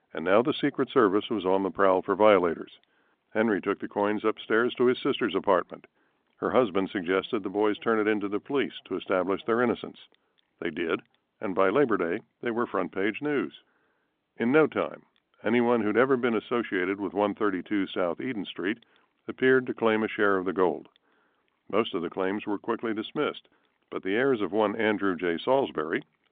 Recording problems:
phone-call audio; nothing above 3.5 kHz

